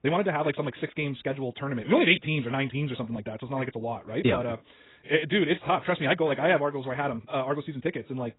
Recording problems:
garbled, watery; badly; nothing above 3.5 kHz
wrong speed, natural pitch; too fast; 1.5 times normal speed

